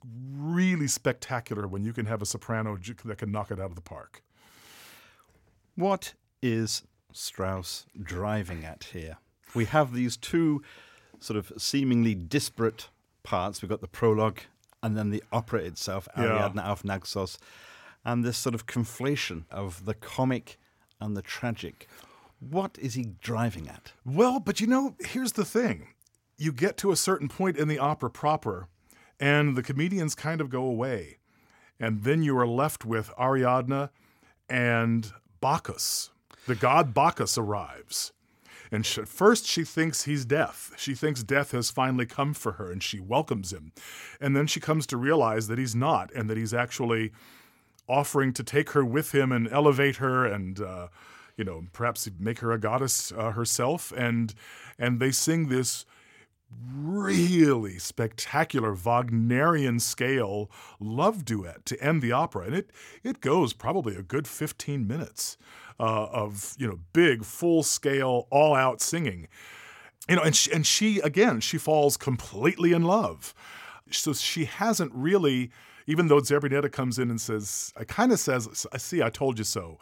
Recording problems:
none

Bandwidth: 16.5 kHz